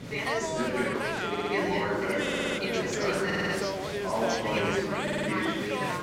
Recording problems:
chatter from many people; very loud; throughout; 5 dB above the speech
audio stuttering; 4 times, first at 1.5 s

